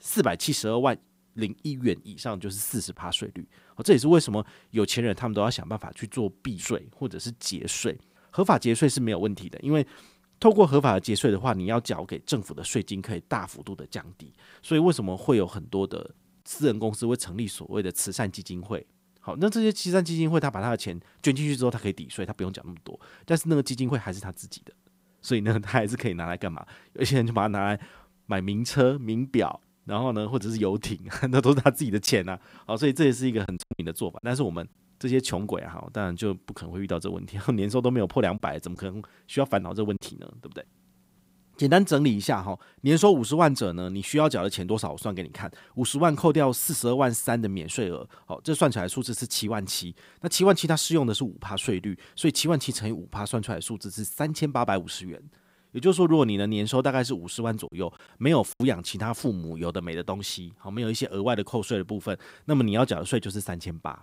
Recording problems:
choppy; very; from 32 to 34 s, from 38 to 40 s and at 58 s; 5% of the speech affected

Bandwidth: 15.5 kHz